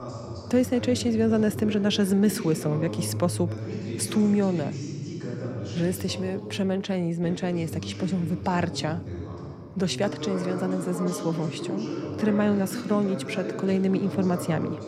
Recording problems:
voice in the background; loud; throughout; 7 dB below the speech

